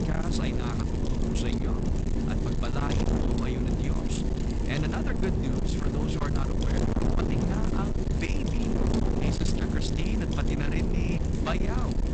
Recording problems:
distortion; heavy; 34% of the sound clipped
high frequencies cut off; noticeable; nothing above 8 kHz
wind noise on the microphone; heavy; 1 dB above the speech

